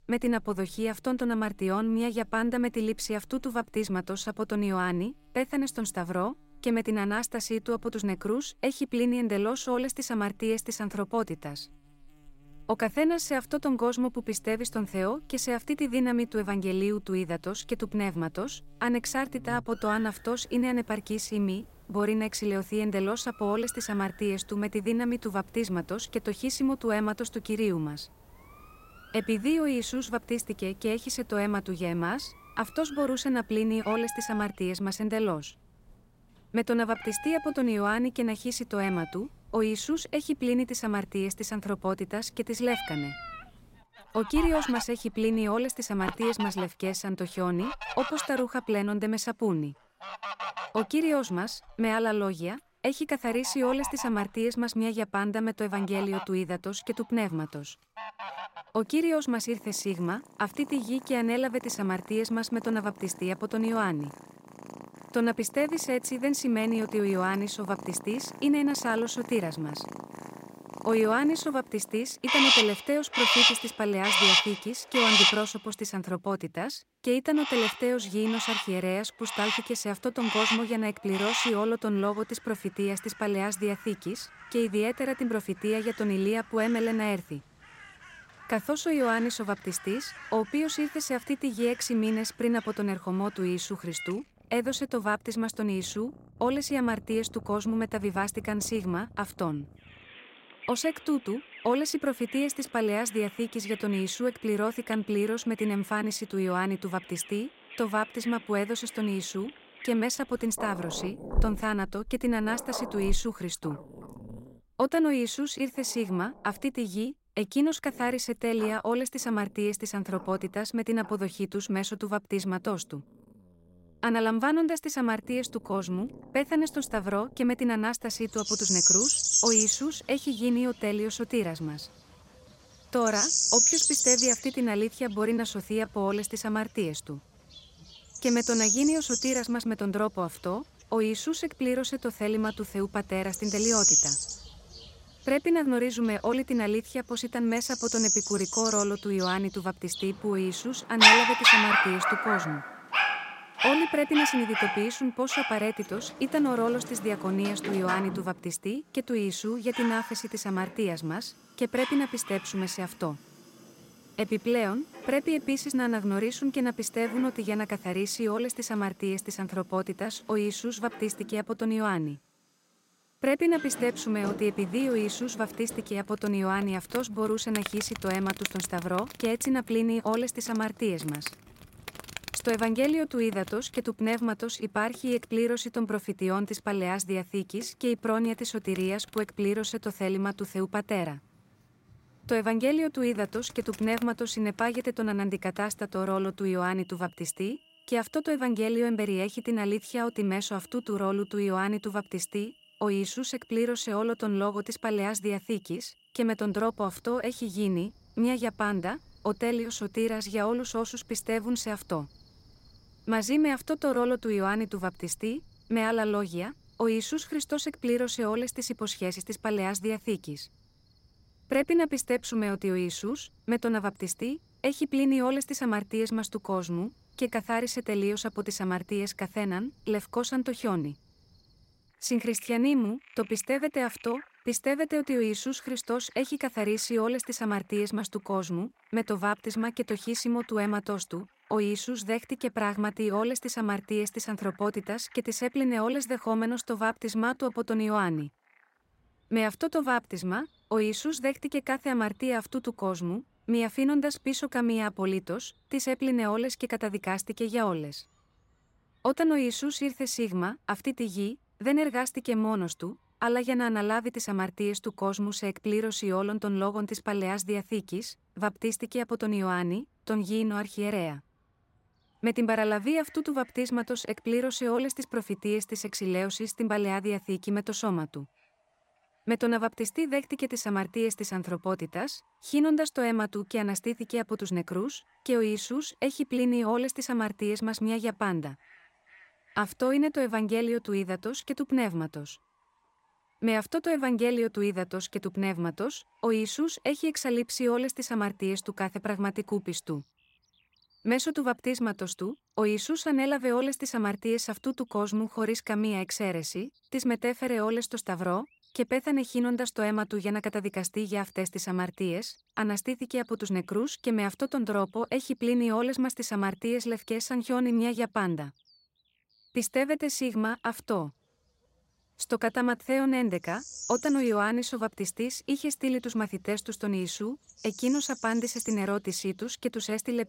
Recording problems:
animal sounds; very loud; throughout; 1 dB above the speech

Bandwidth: 16 kHz